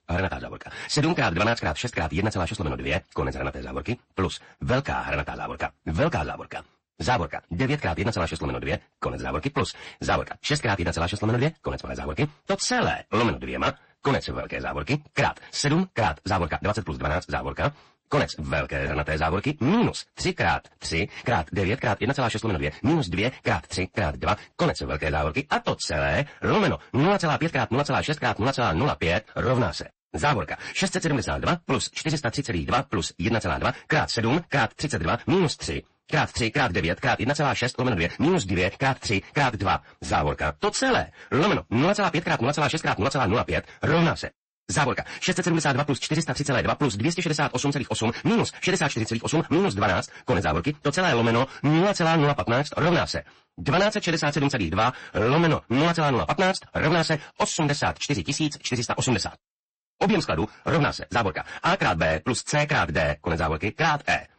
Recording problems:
wrong speed, natural pitch; too fast; 1.8 times normal speed
distortion; slight; 8% of the sound clipped
garbled, watery; slightly; nothing above 8 kHz

